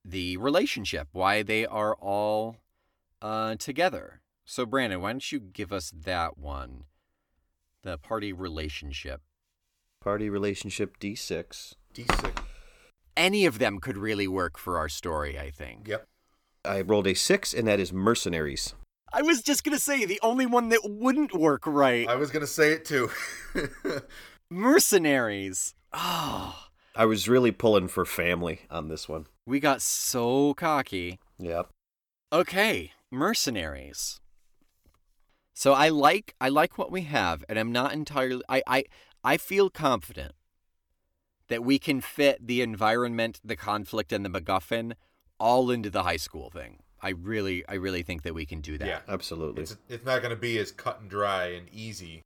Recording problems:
none

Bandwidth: 18.5 kHz